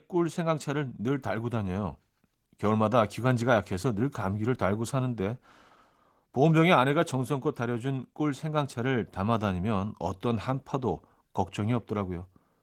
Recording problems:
garbled, watery; slightly; nothing above 17.5 kHz

